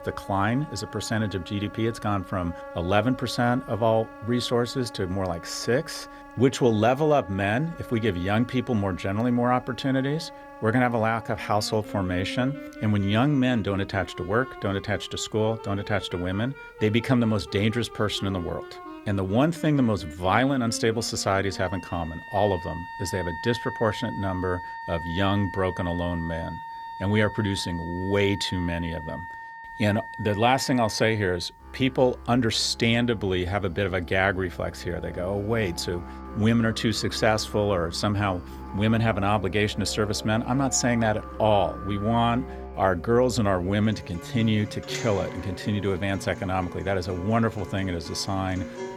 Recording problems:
background music; noticeable; throughout; 15 dB below the speech

